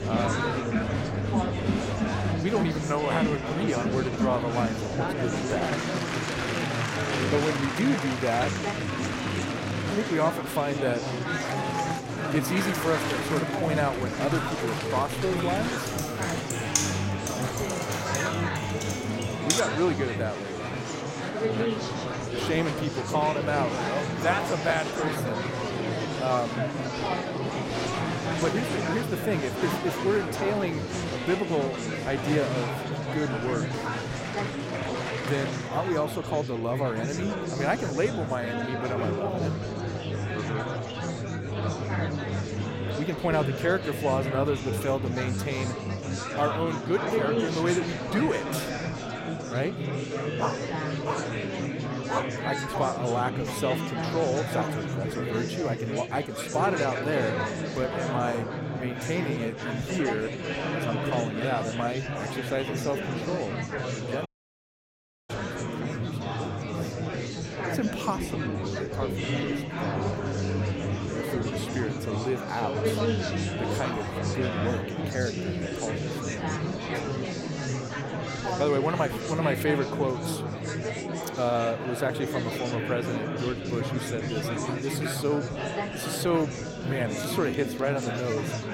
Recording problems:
murmuring crowd; very loud; throughout; as loud as the speech
keyboard typing; loud; from 16 to 20 s; peak 4 dB above the speech
dog barking; noticeable; from 50 to 52 s; peak 2 dB below the speech
audio cutting out; at 1:04 for 1 s

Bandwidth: 16 kHz